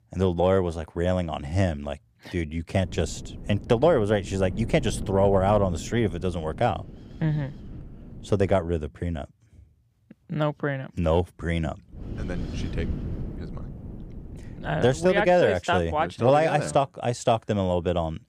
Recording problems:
wind noise on the microphone; occasional gusts; from 3 to 8.5 s and from 12 to 15 s; 20 dB below the speech

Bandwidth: 15 kHz